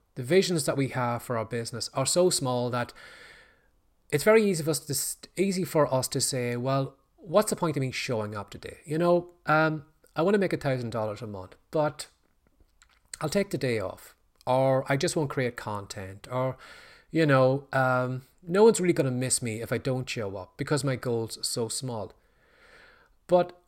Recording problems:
none

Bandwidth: 16 kHz